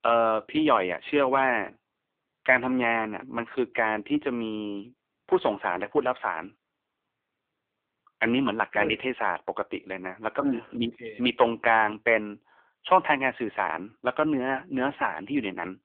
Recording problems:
phone-call audio; poor line

